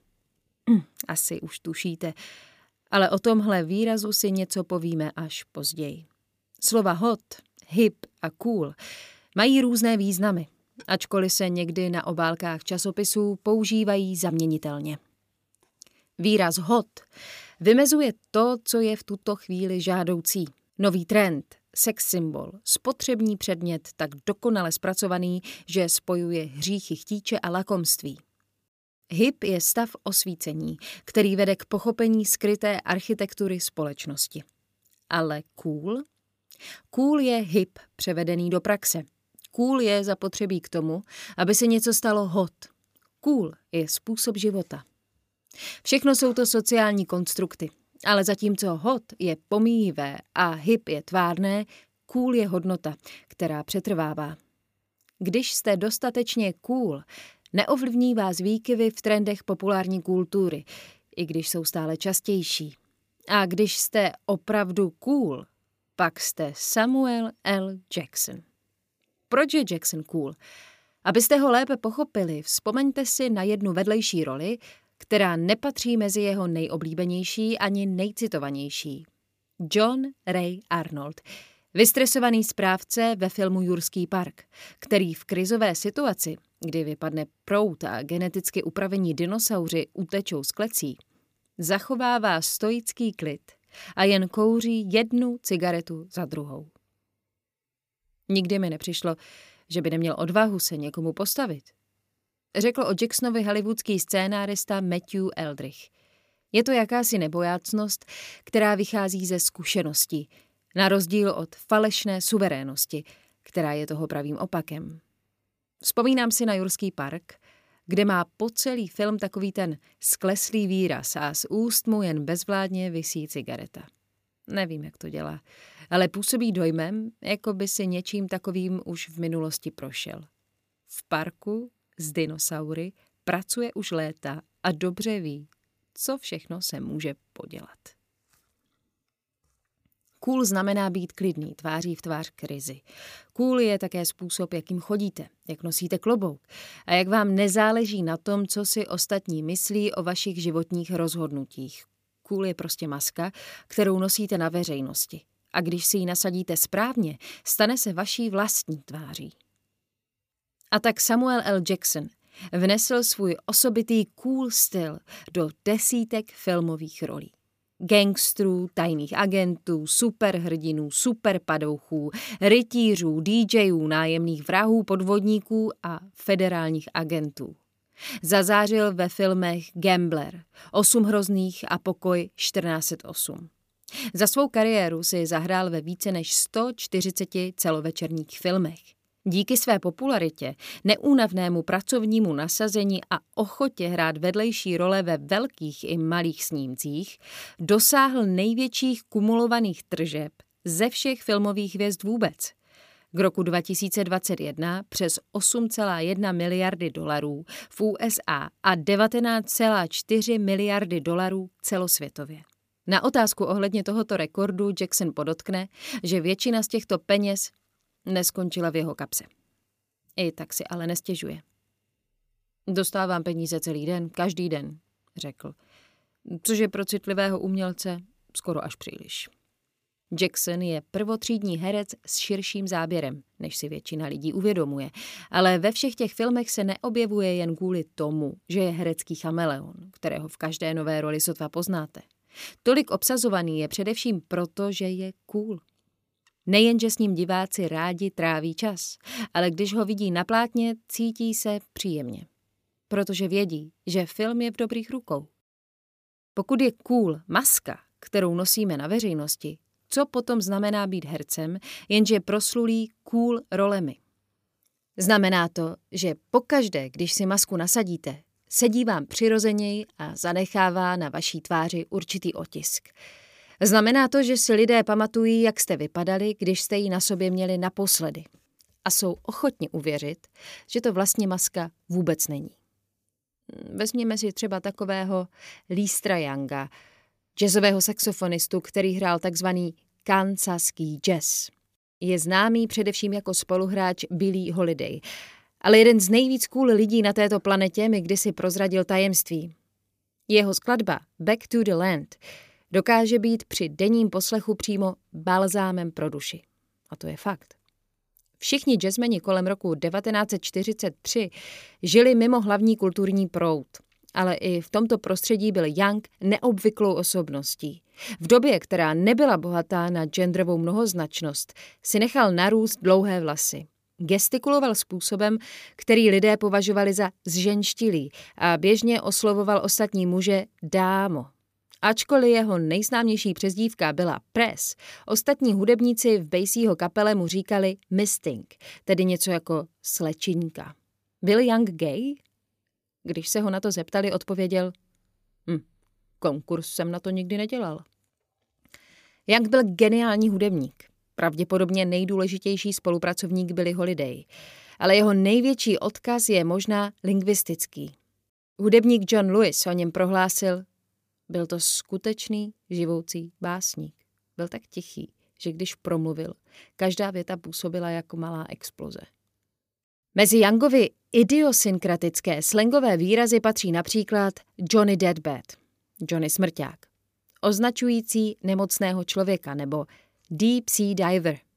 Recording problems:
none

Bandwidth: 15 kHz